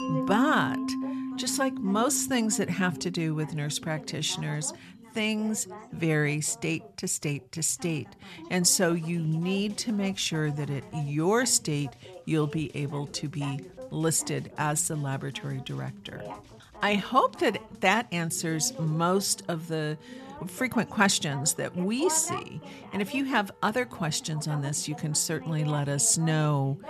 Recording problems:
background music; loud; throughout; 8 dB below the speech
background chatter; noticeable; throughout; 2 voices, 15 dB below the speech

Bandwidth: 13.5 kHz